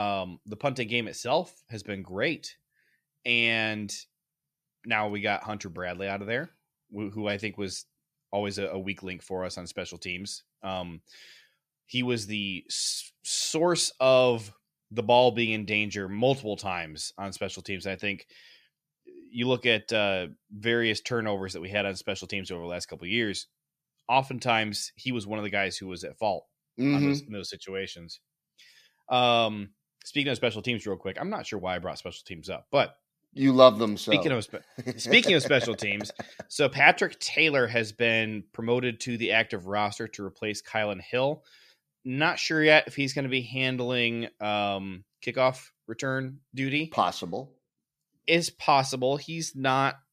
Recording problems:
abrupt cut into speech; at the start

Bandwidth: 14.5 kHz